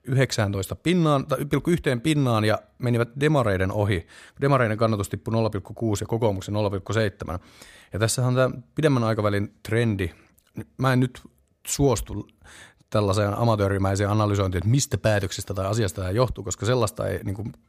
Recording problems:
none

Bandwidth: 15 kHz